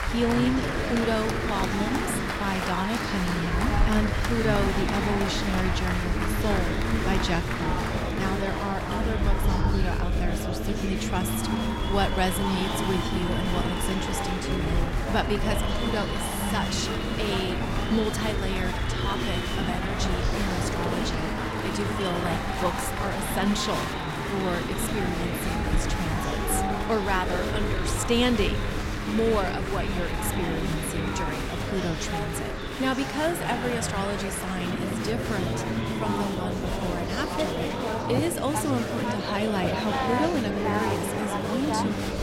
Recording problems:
chatter from many people; very loud; throughout; 1 dB above the speech
wind noise on the microphone; occasional gusts; 20 dB below the speech

